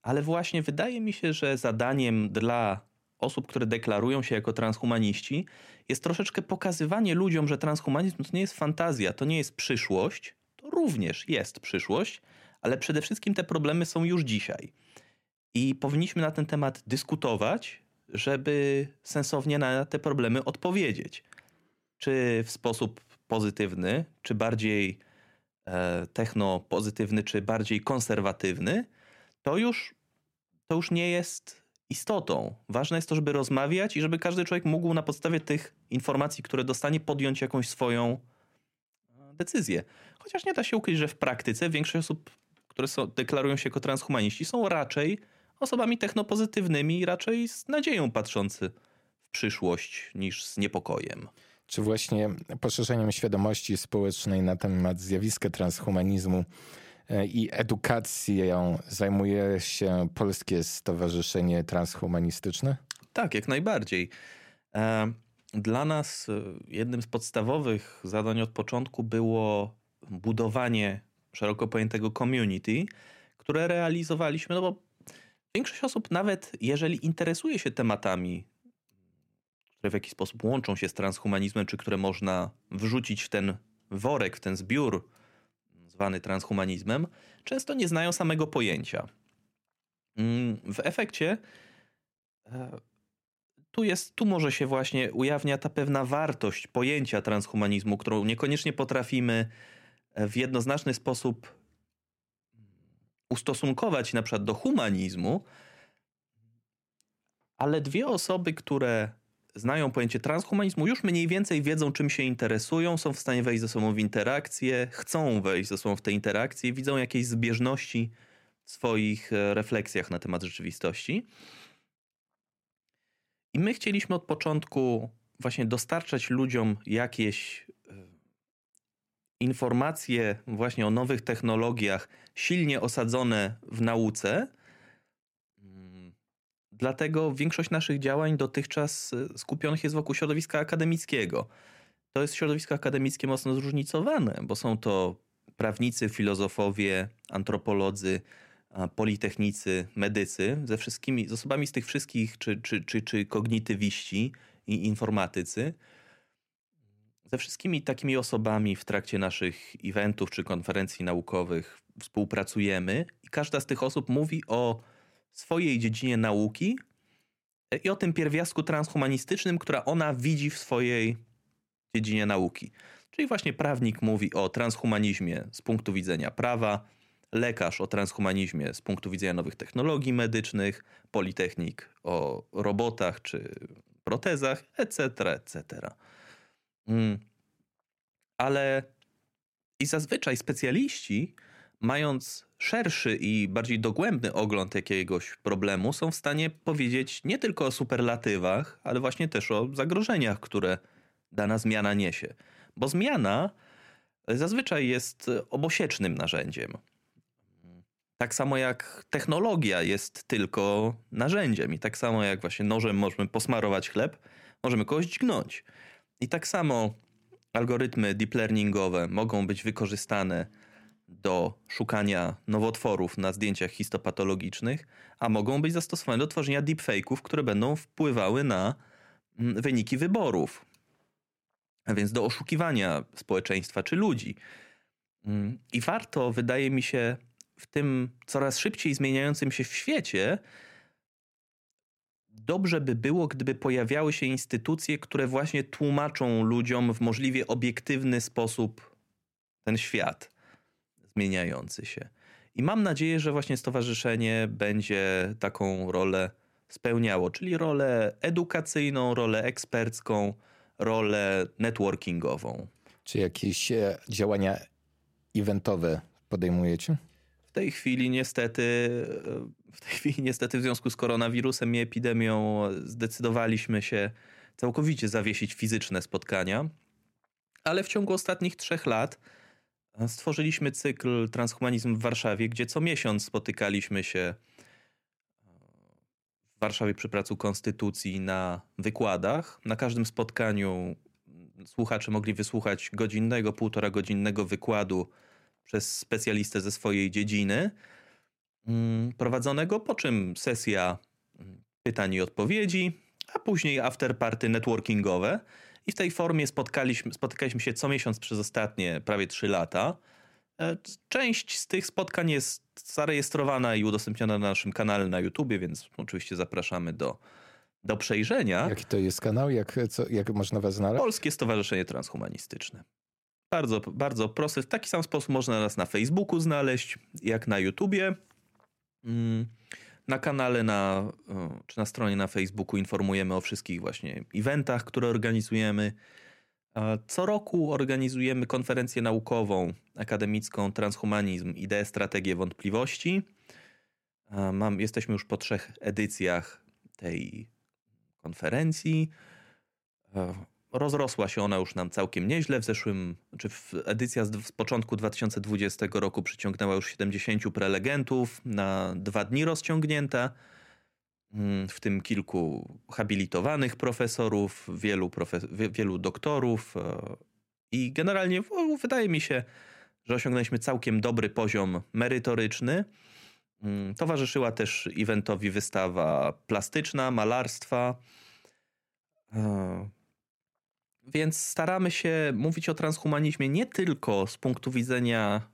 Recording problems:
none

